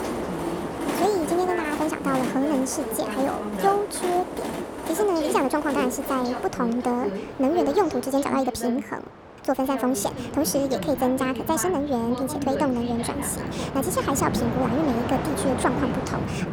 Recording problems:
wrong speed and pitch; too fast and too high; 1.5 times normal speed
train or aircraft noise; loud; throughout; 7 dB below the speech
voice in the background; loud; throughout; 9 dB below the speech

